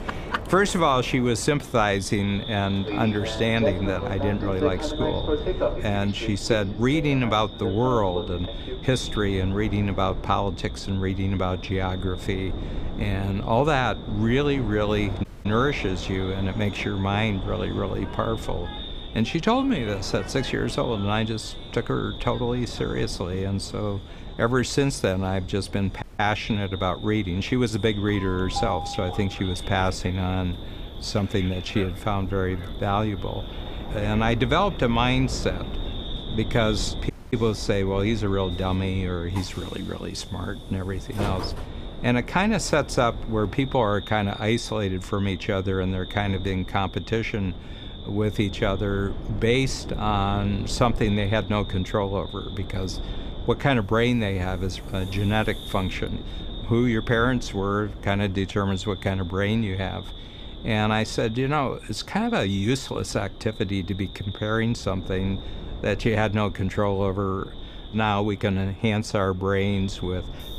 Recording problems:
echo of what is said; noticeable; throughout; 500 ms later, 15 dB below the speech
train or aircraft noise; noticeable; throughout; 10 dB below the speech
wind noise on the microphone; occasional gusts; 20 dB below the speech
audio cutting out; at 15 s, at 26 s and at 37 s

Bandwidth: 15 kHz